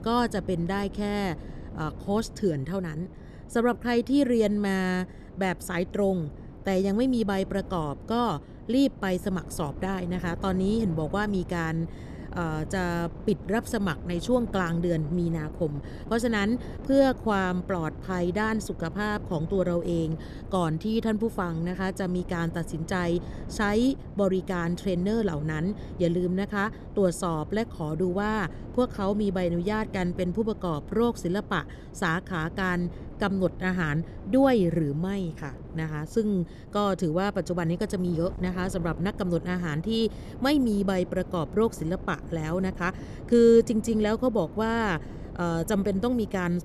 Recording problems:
wind noise on the microphone; occasional gusts; 20 dB below the speech

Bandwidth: 13.5 kHz